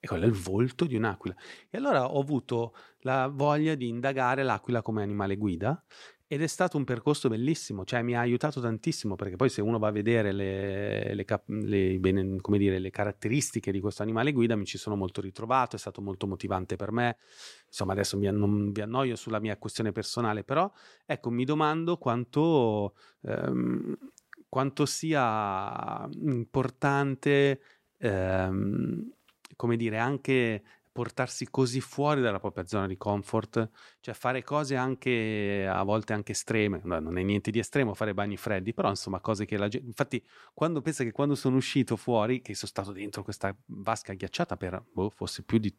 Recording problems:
none

